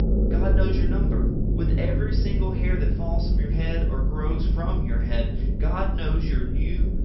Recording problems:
off-mic speech; far
high frequencies cut off; noticeable; nothing above 5.5 kHz
room echo; slight; dies away in 0.4 s
low rumble; loud; throughout; 2 dB below the speech

